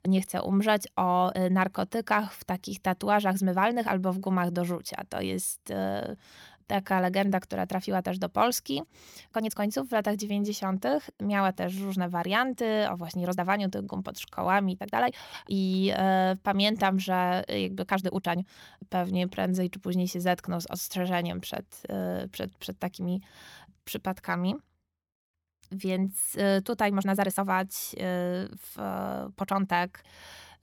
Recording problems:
uneven, jittery; strongly; from 1 to 30 s

